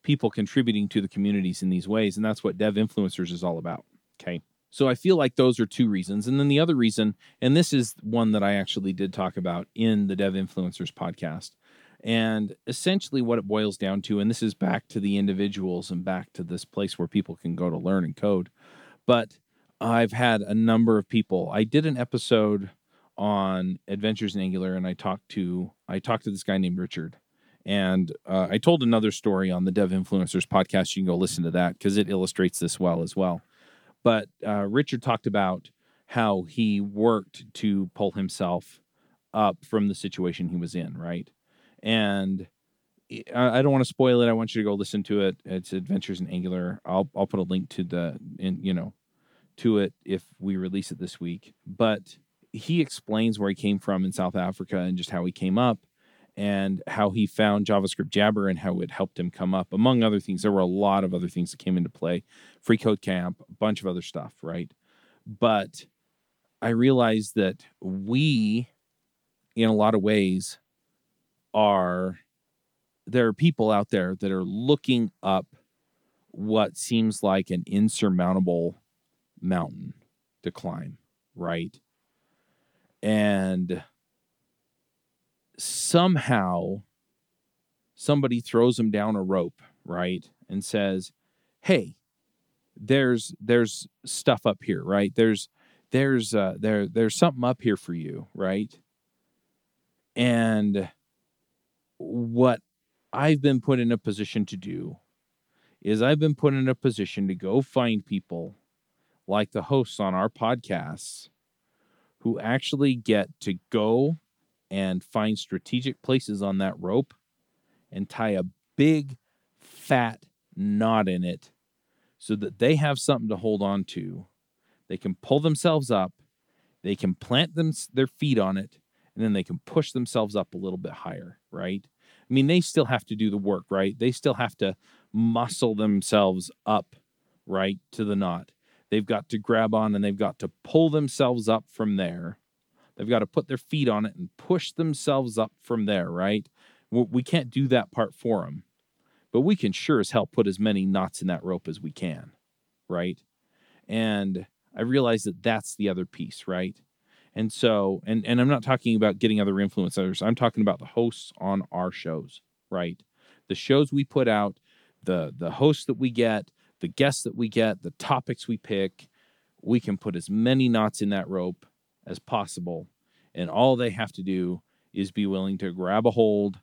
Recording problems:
none

